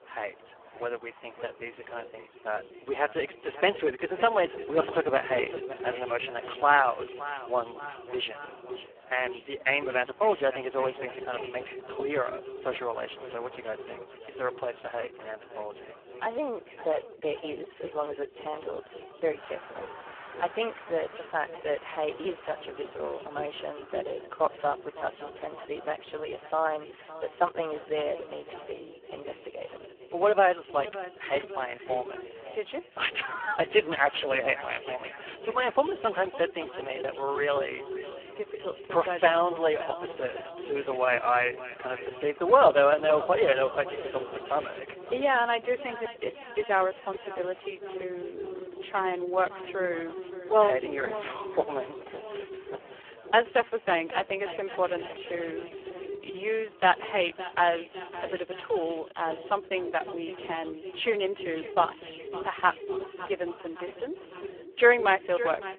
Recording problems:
phone-call audio; poor line
echo of what is said; strong; throughout; 560 ms later, 10 dB below the speech
traffic noise; faint; throughout; 25 dB below the speech
voice in the background; faint; throughout; 25 dB below the speech

